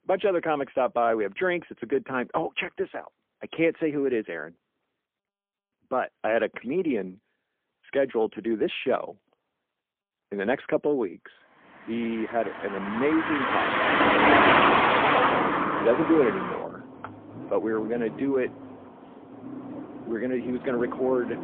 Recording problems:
phone-call audio; poor line; nothing above 3.5 kHz
traffic noise; very loud; from 12 s on; 4 dB above the speech

